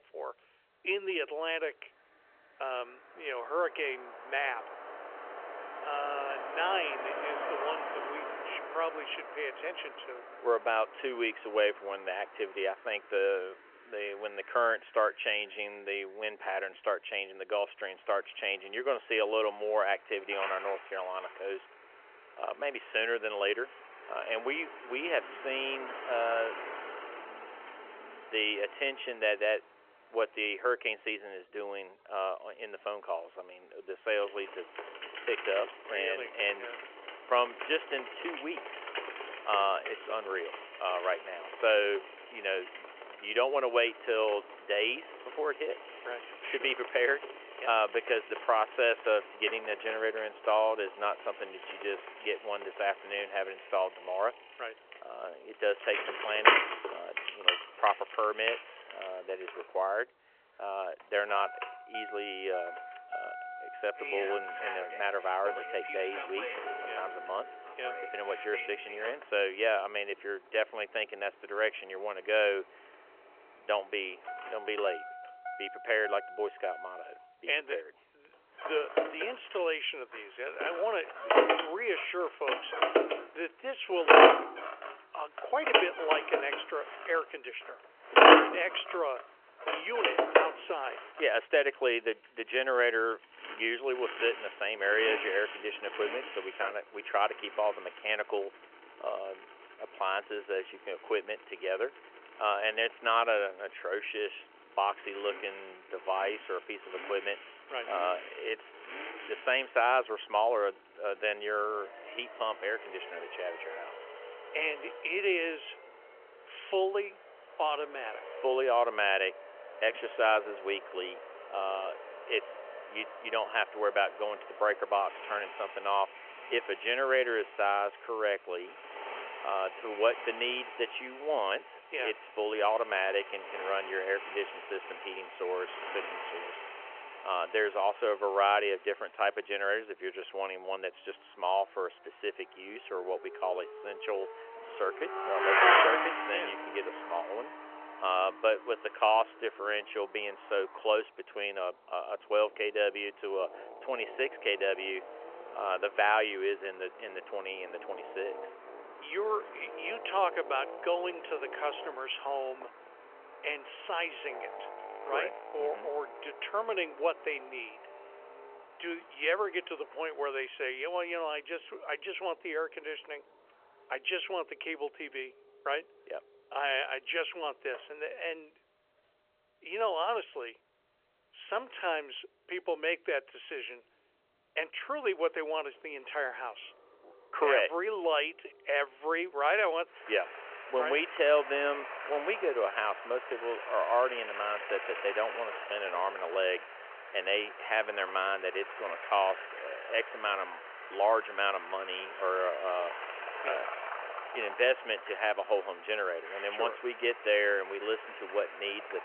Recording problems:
phone-call audio; nothing above 3 kHz
traffic noise; loud; throughout; 2 dB below the speech

